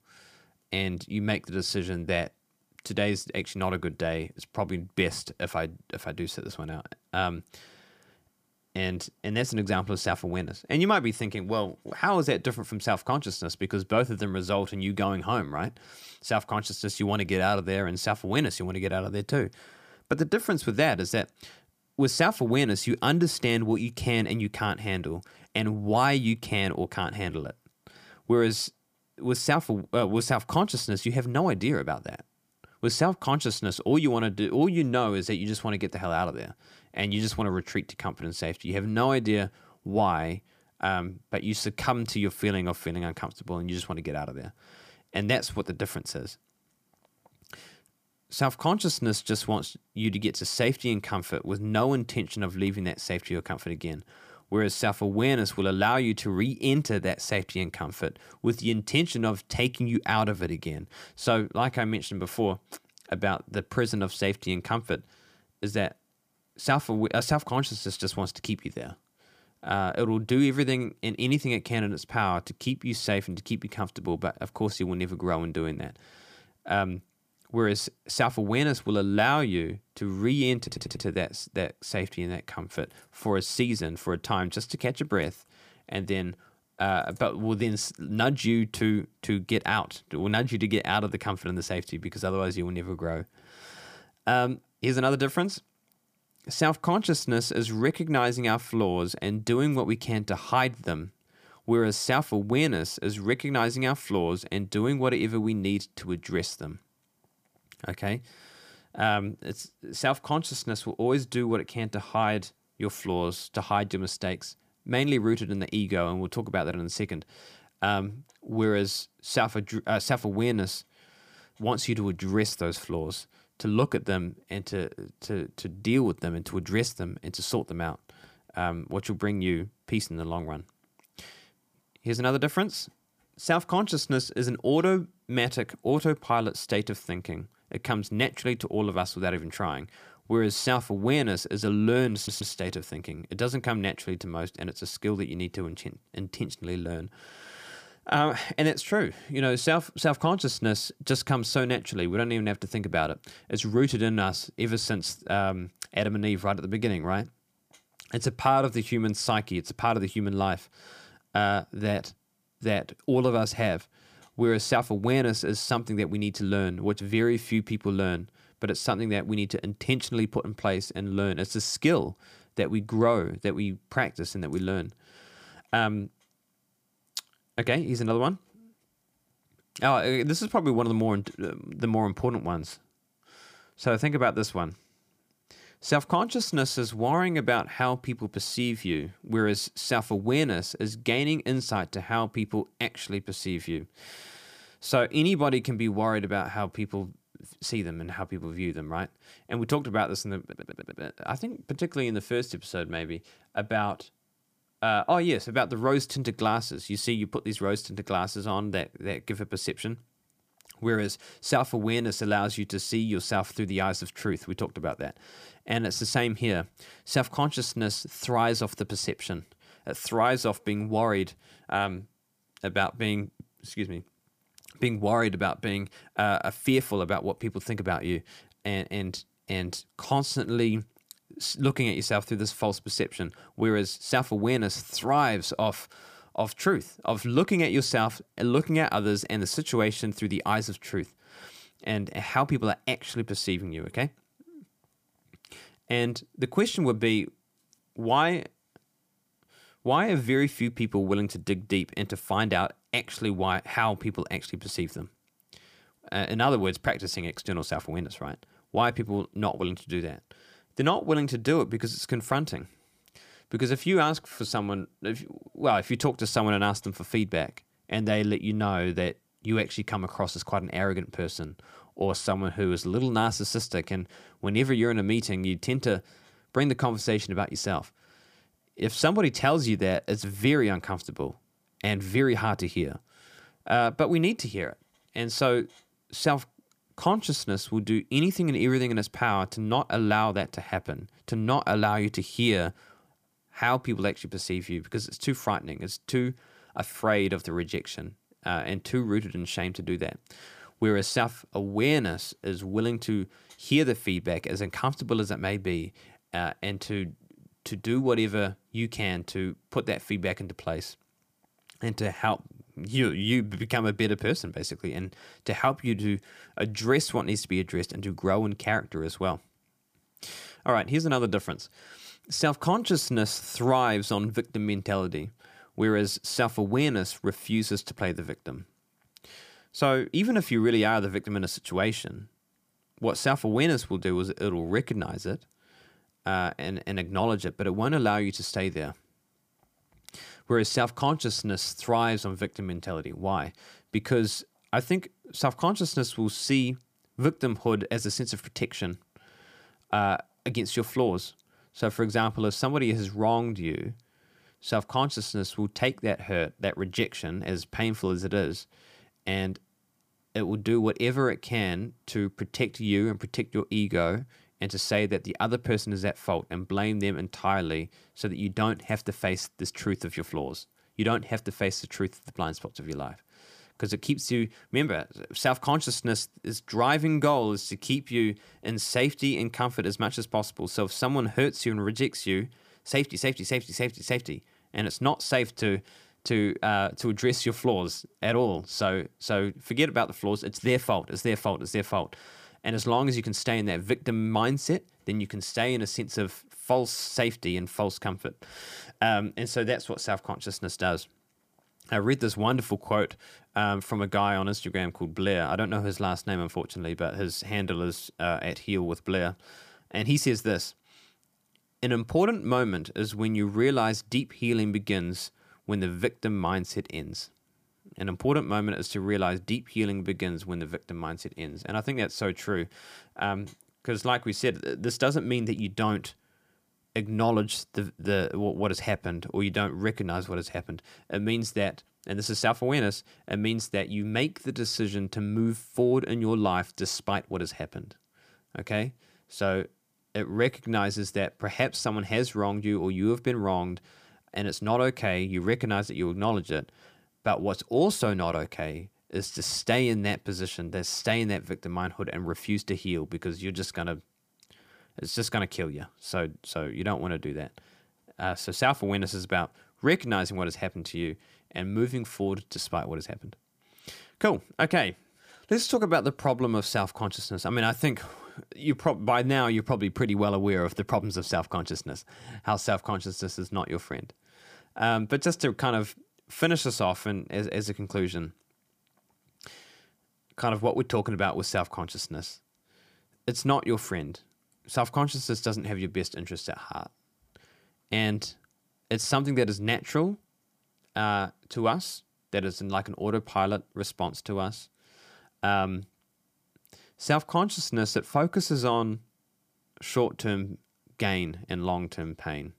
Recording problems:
audio stuttering; at 1:21, at 2:22 and at 3:20

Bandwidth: 15 kHz